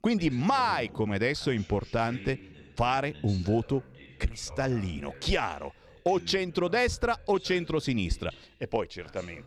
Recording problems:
voice in the background; noticeable; throughout; 20 dB below the speech

